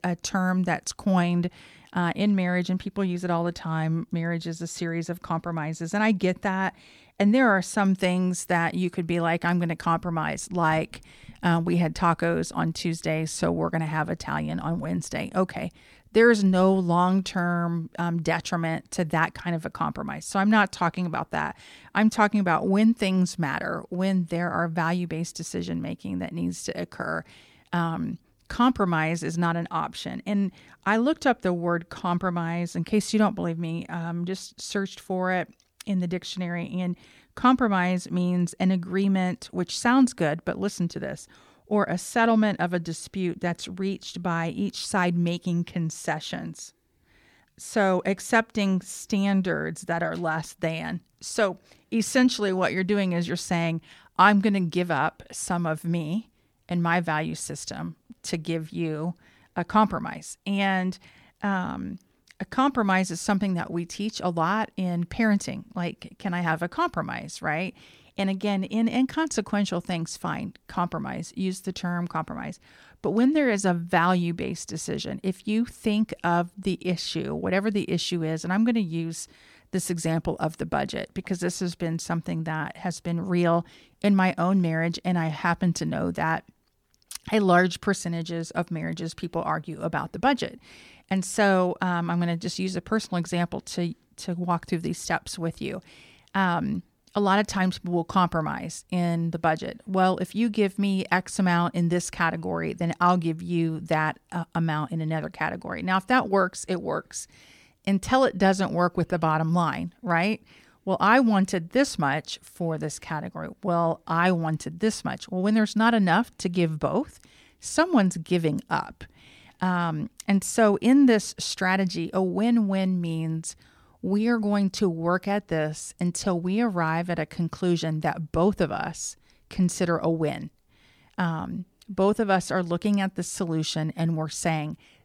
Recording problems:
none

